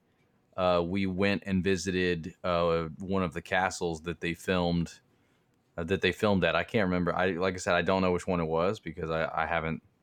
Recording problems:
none

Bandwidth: 18.5 kHz